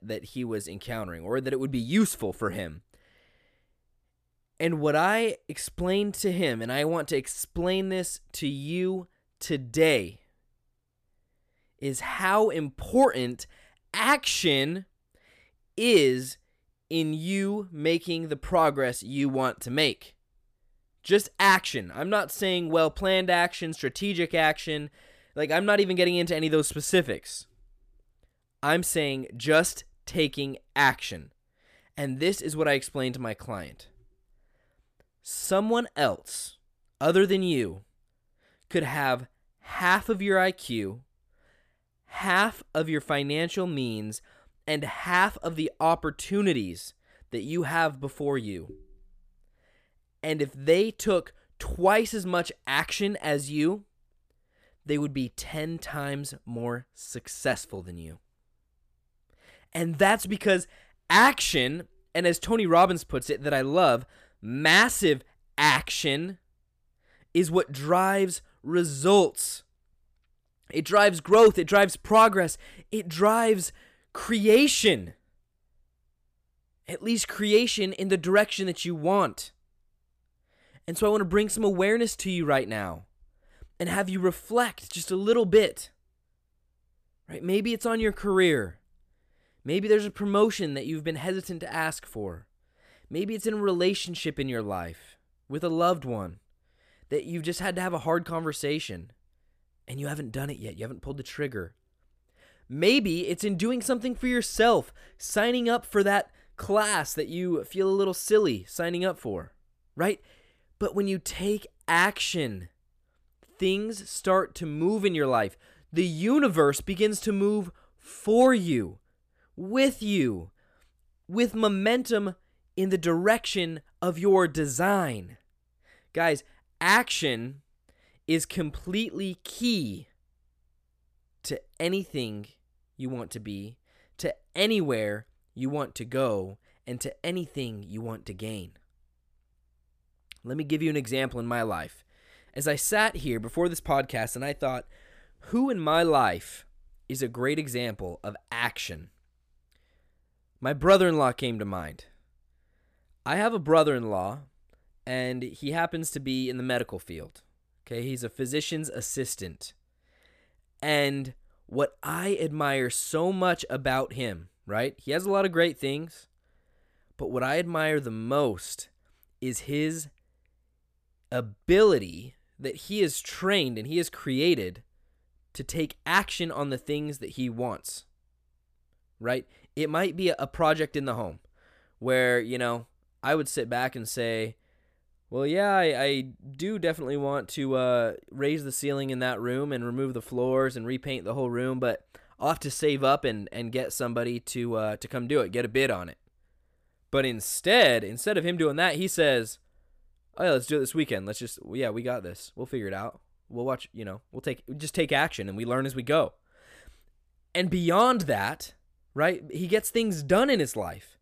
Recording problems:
none

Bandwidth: 14.5 kHz